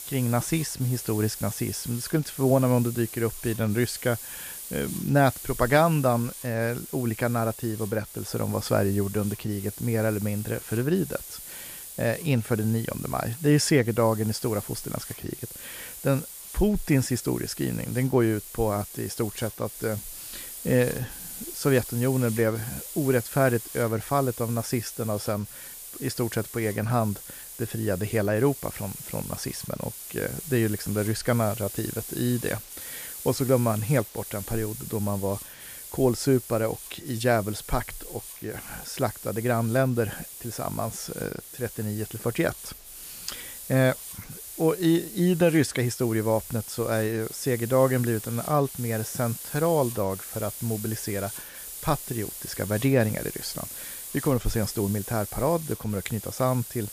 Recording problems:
hiss; noticeable; throughout; 10 dB below the speech

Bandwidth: 15 kHz